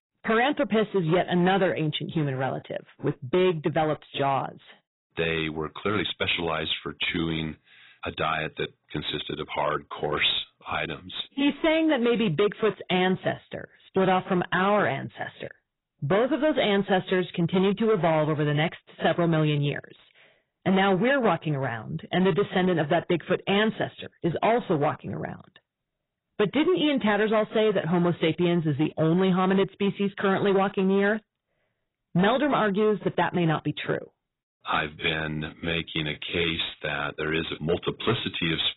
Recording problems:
garbled, watery; badly; nothing above 4 kHz
distortion; slight; 8% of the sound clipped

